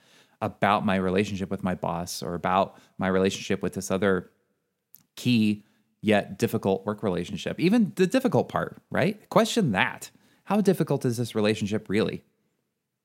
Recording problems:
none

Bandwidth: 16 kHz